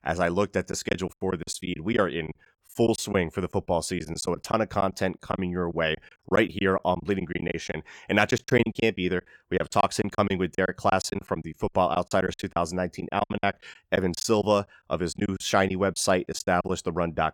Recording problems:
choppy; very; 12% of the speech affected

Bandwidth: 18 kHz